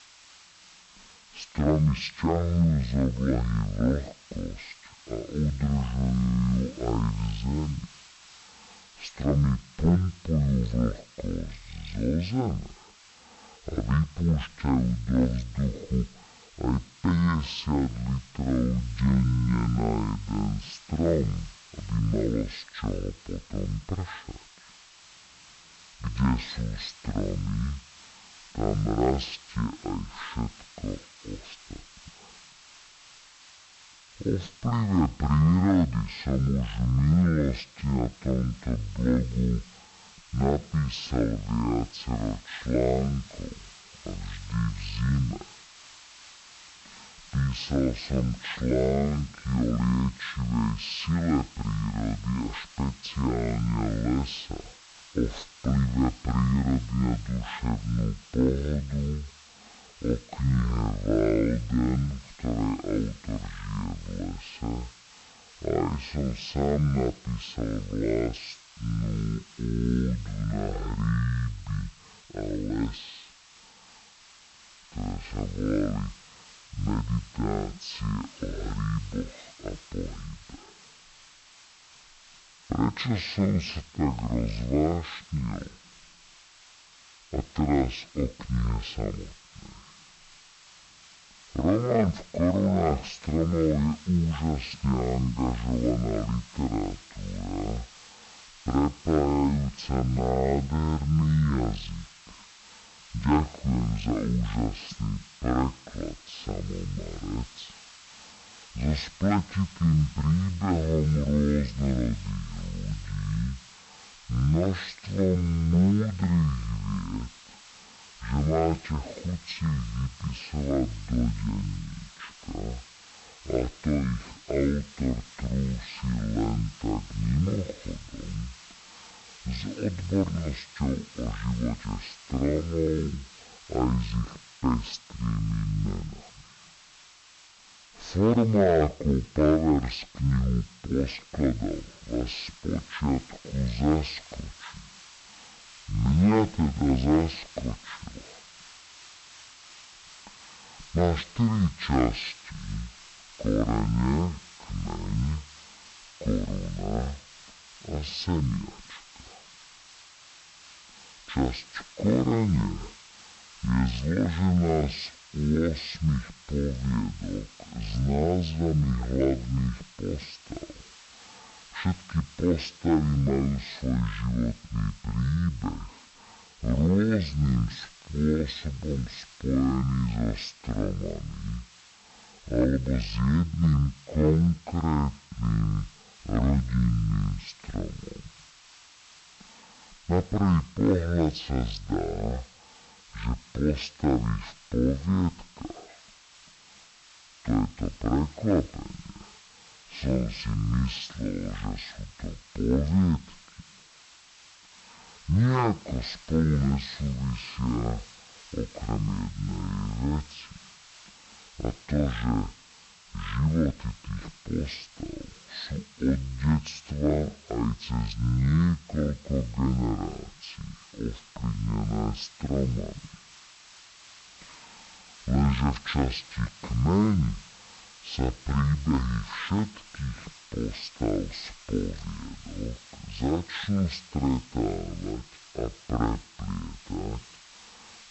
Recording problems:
wrong speed and pitch; too slow and too low; 0.5 times normal speed
high frequencies cut off; noticeable; nothing above 7 kHz
hiss; faint; throughout; 20 dB below the speech

